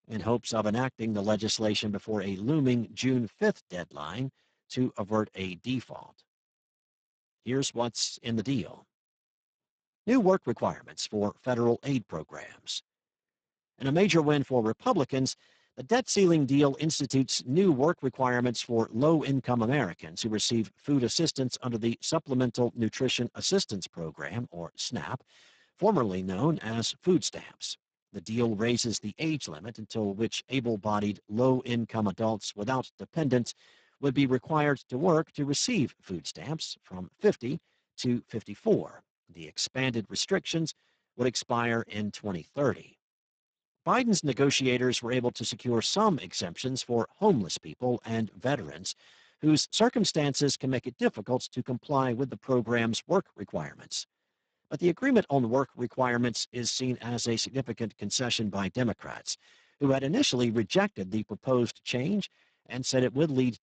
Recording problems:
garbled, watery; badly; nothing above 7.5 kHz

